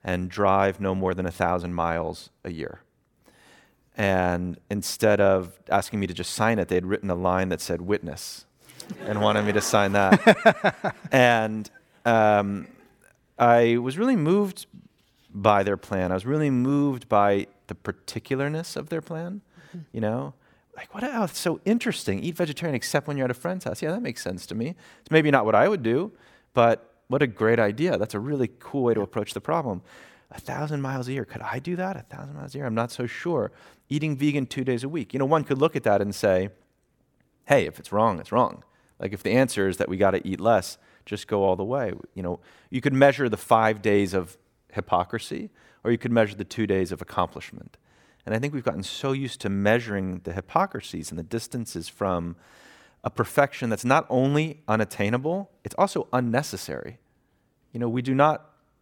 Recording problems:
none

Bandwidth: 17.5 kHz